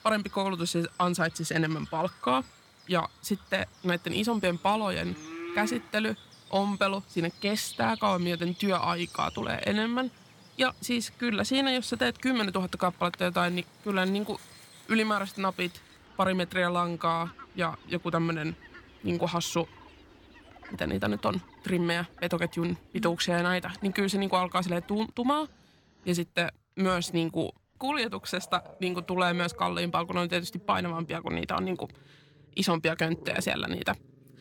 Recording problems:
animal sounds; noticeable; throughout; 20 dB below the speech

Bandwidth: 17 kHz